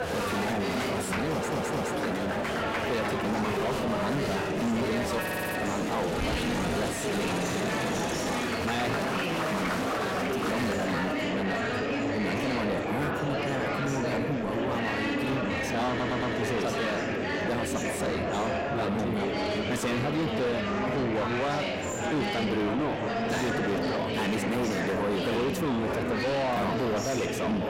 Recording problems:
distortion; heavy; 6 dB below the speech
murmuring crowd; very loud; throughout; 1 dB above the speech
audio stuttering; at 1.5 s, at 5 s and at 16 s

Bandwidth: 16 kHz